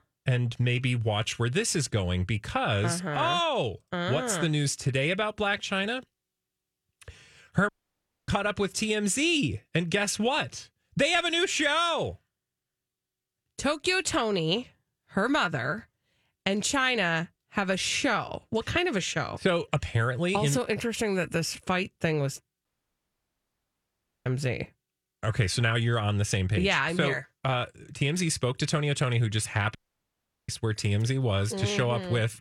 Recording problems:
audio cutting out; at 7.5 s for 0.5 s, at 23 s for 1.5 s and at 30 s for 0.5 s

